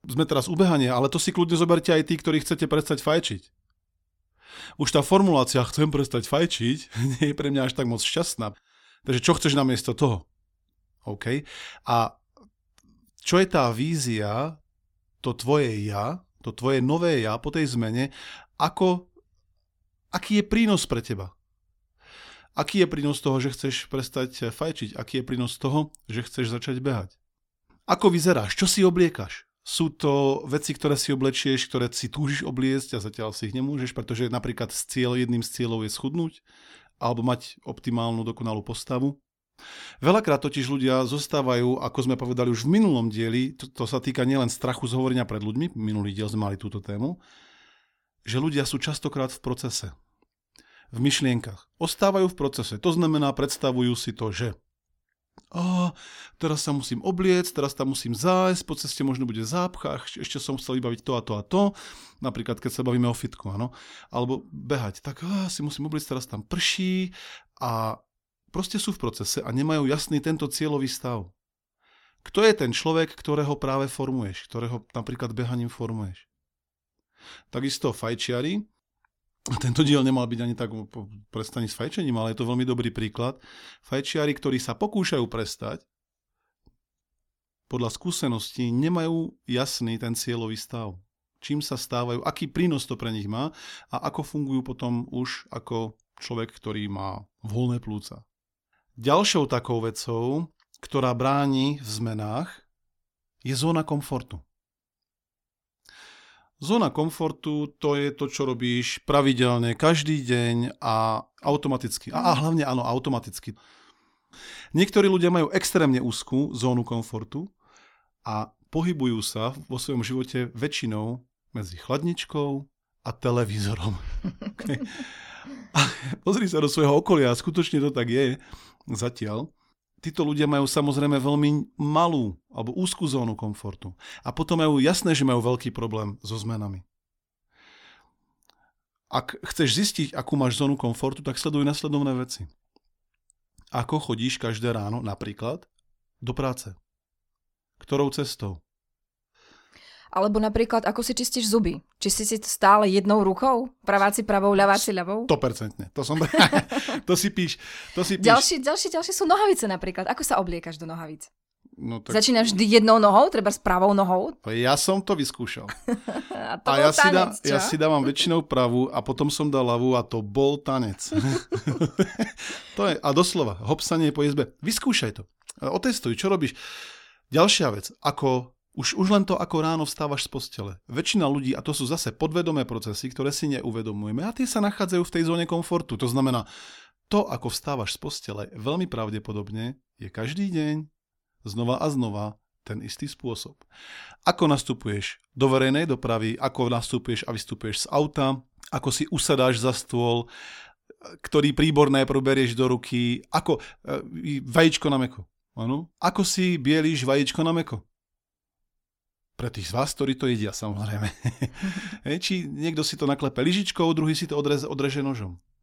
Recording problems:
none

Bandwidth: 17 kHz